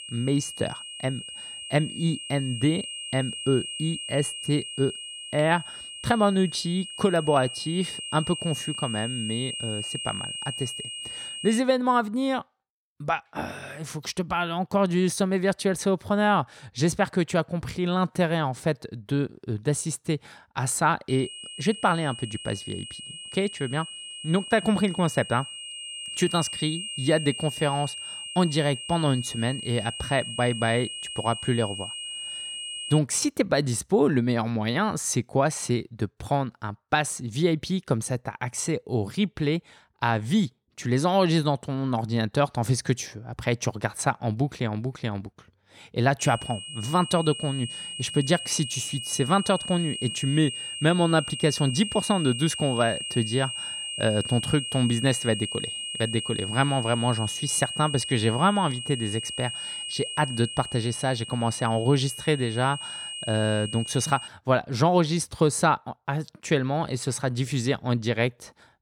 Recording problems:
high-pitched whine; loud; until 12 s, from 21 to 33 s and from 46 s to 1:04; 3 kHz, 7 dB below the speech

